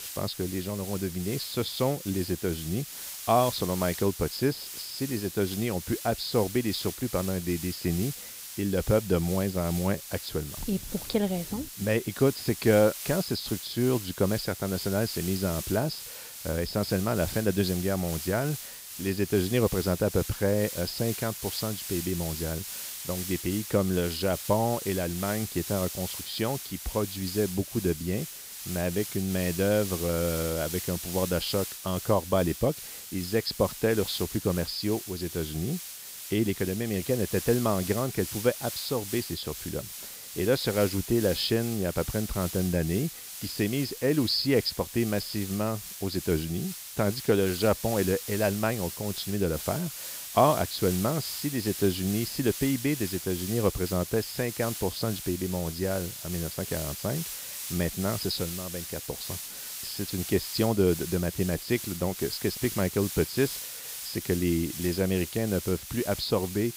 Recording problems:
high frequencies cut off; noticeable; nothing above 5.5 kHz
hiss; loud; throughout; 7 dB below the speech

